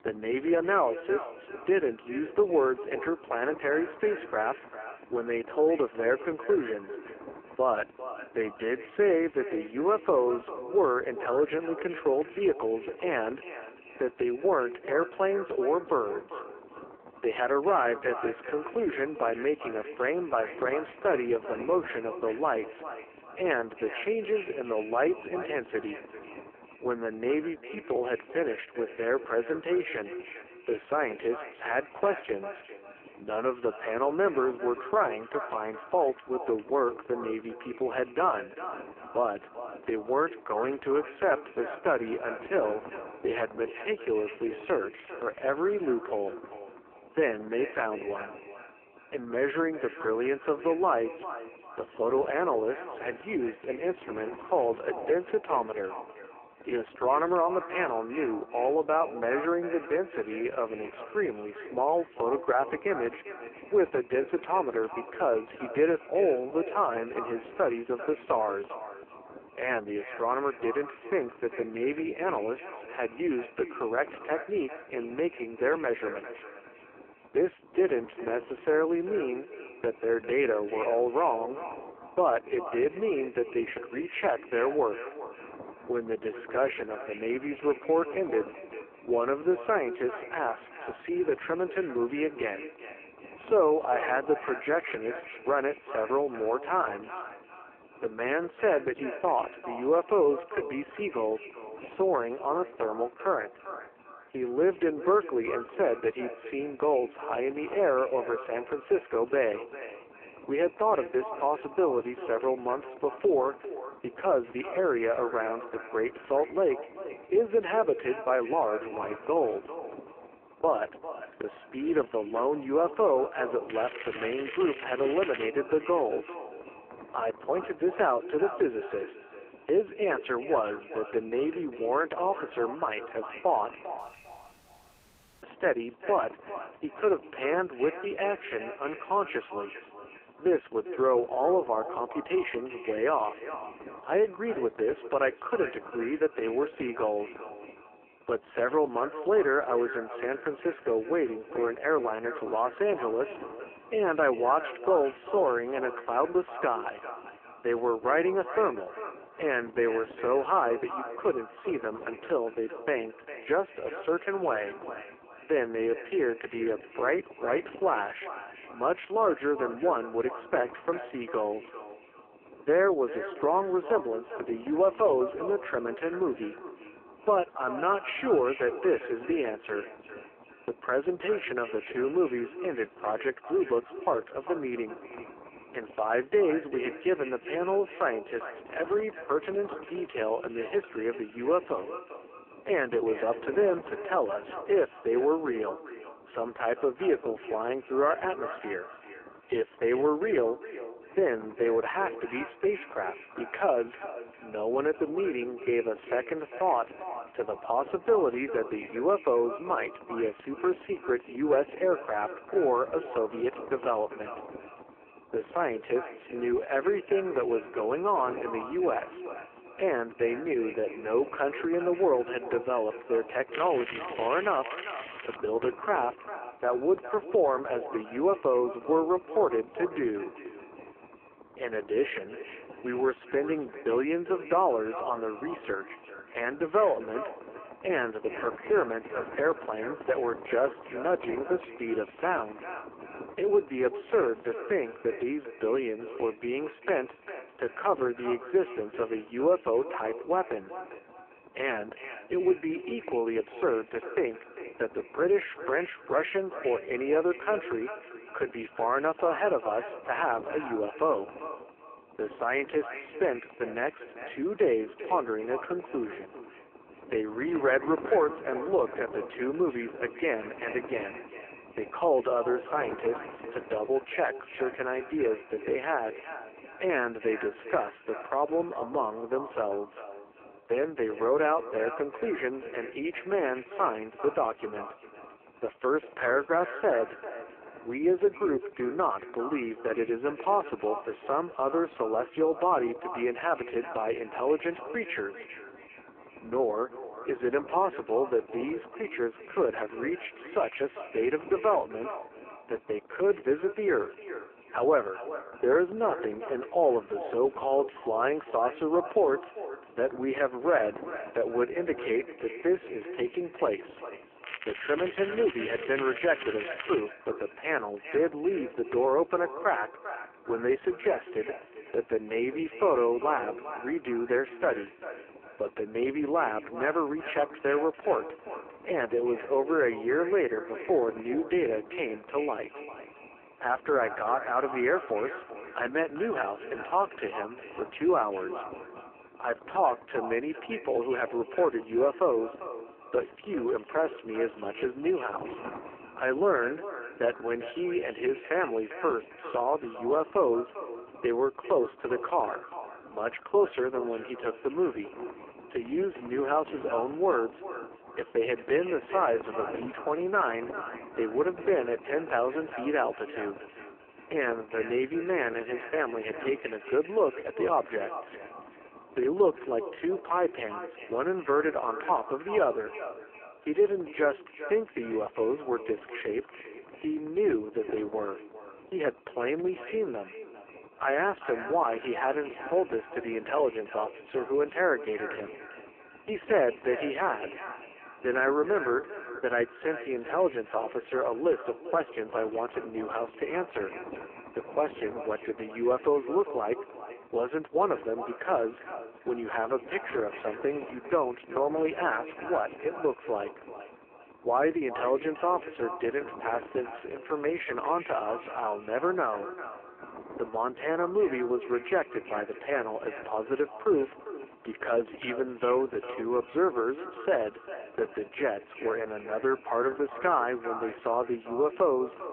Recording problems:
phone-call audio; poor line
echo of what is said; noticeable; throughout; 400 ms later, 15 dB below the speech
wind noise on the microphone; occasional gusts; 20 dB below the speech
crackling; noticeable; from 2:04 to 2:05, from 3:44 to 3:45 and from 5:14 to 5:17; 10 dB below the speech
audio cutting out; at 2:14 for 1.5 s

